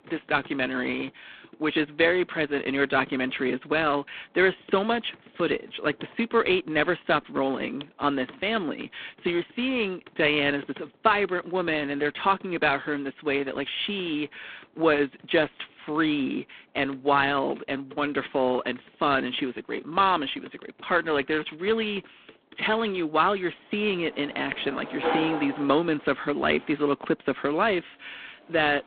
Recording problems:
phone-call audio; poor line; nothing above 3.5 kHz
household noises; noticeable; throughout; 15 dB below the speech

